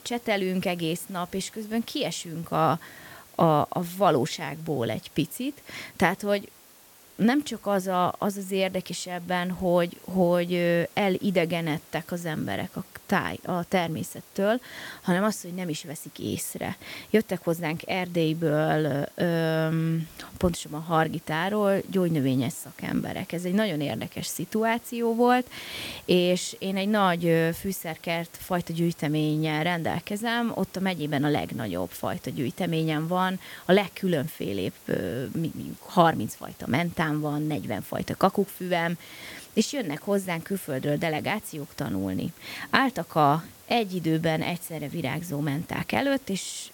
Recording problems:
hiss; faint; throughout; 20 dB below the speech

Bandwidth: 17 kHz